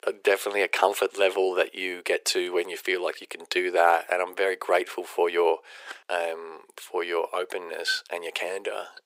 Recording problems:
thin; very; fading below 400 Hz

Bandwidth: 15.5 kHz